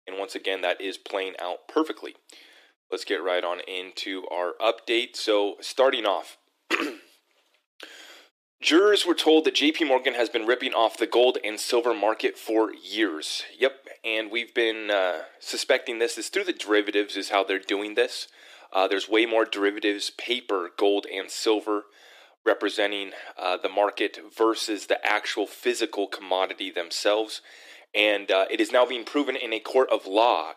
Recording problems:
thin; somewhat; fading below 300 Hz

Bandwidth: 14.5 kHz